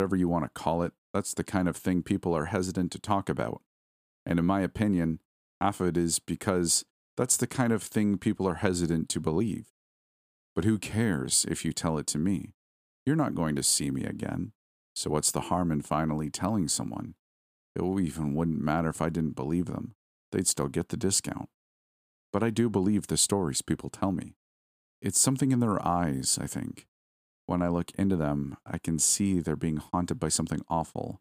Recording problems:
abrupt cut into speech; at the start

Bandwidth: 15 kHz